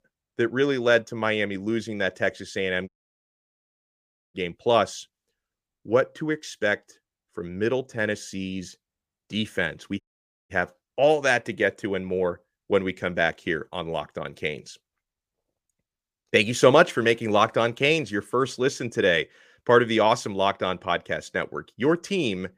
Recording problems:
audio cutting out; at 3 s for 1.5 s and at 10 s

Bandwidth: 15 kHz